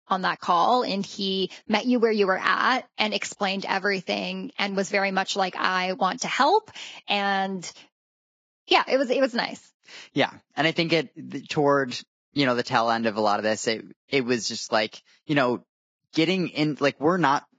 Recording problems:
garbled, watery; badly; nothing above 7.5 kHz

